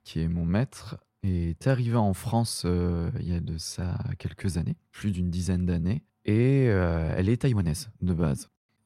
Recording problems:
muffled; slightly; fading above 3.5 kHz
uneven, jittery; strongly; from 0.5 to 8.5 s

